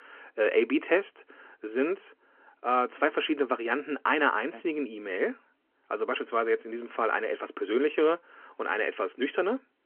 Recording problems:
phone-call audio

